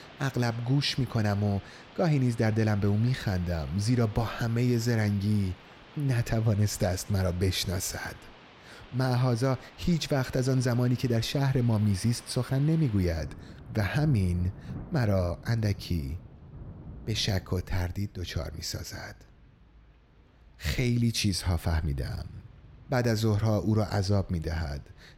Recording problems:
rain or running water; faint; throughout; 20 dB below the speech

